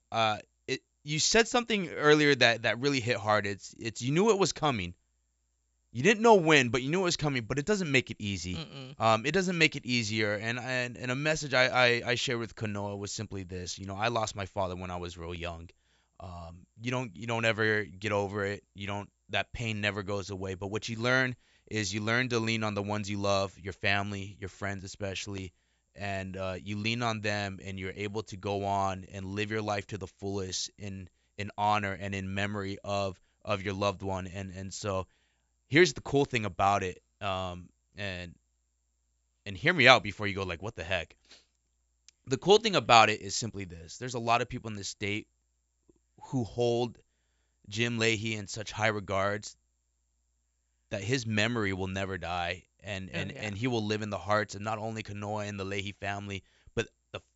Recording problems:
high frequencies cut off; noticeable; nothing above 8 kHz

